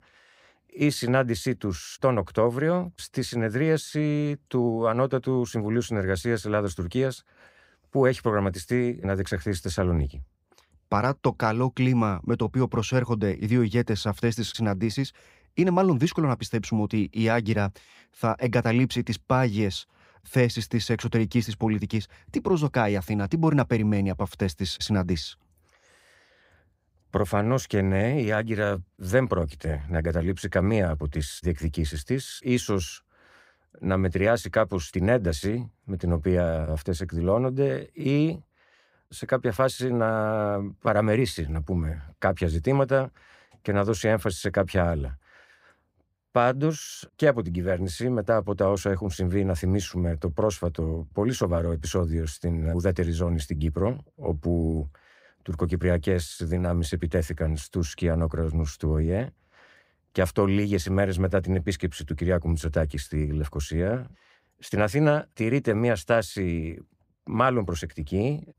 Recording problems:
none

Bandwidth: 15.5 kHz